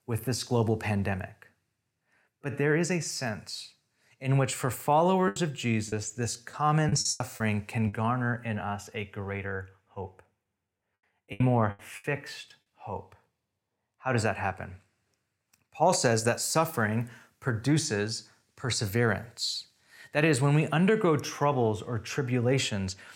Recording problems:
choppy; very; from 5.5 to 8 s and at 11 s; 10% of the speech affected

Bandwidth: 16.5 kHz